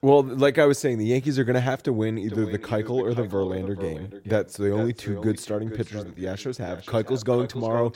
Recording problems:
echo of what is said; noticeable; from 2.5 s on; 440 ms later, 15 dB below the speech

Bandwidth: 16 kHz